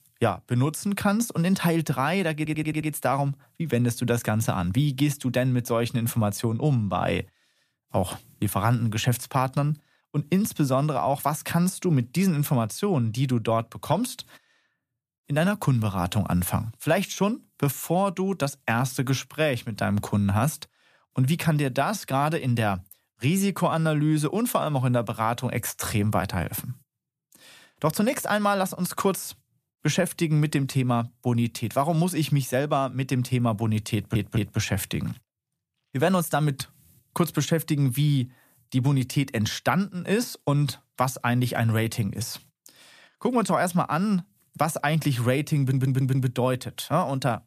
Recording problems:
audio stuttering; at 2.5 s, at 34 s and at 46 s

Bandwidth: 14.5 kHz